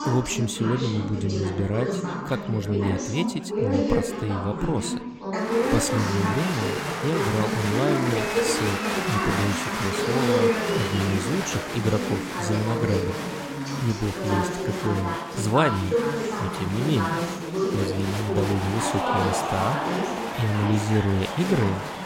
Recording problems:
chatter from many people; very loud; throughout; as loud as the speech

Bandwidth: 16.5 kHz